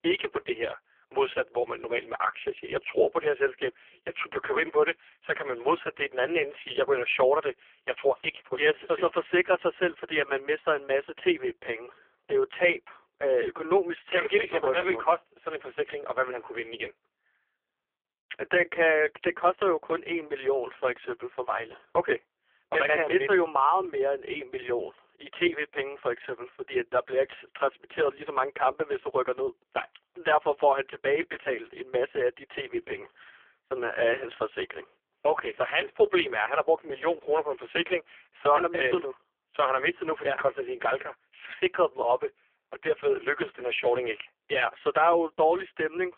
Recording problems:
phone-call audio; poor line; nothing above 3.5 kHz

